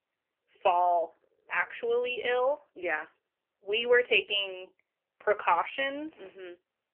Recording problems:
phone-call audio; poor line; nothing above 3 kHz

